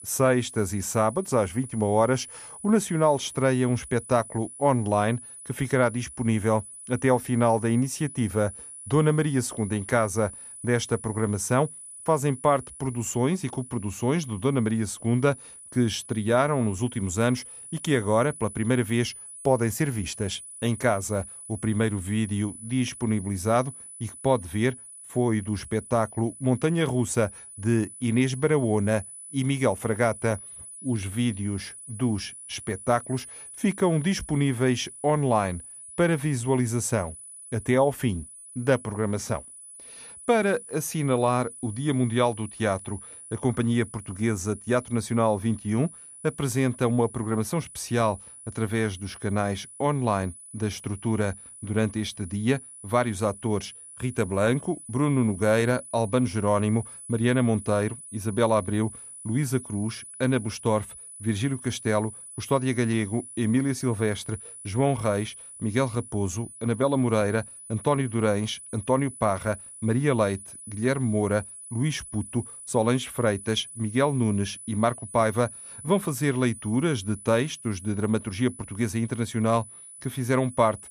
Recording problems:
high-pitched whine; noticeable; throughout; 10 kHz, 15 dB below the speech

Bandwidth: 14.5 kHz